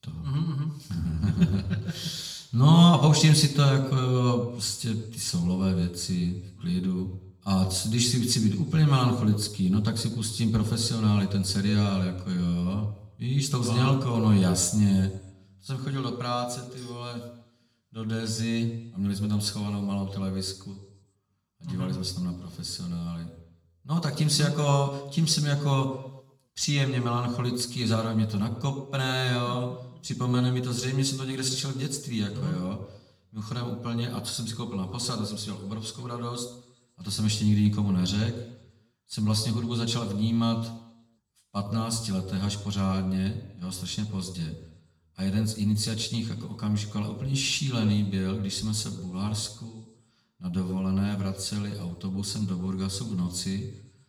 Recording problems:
room echo; slight; dies away in 0.8 s
off-mic speech; somewhat distant

